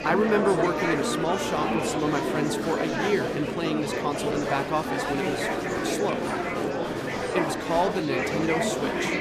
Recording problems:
murmuring crowd; very loud; throughout; 1 dB above the speech

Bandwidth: 14.5 kHz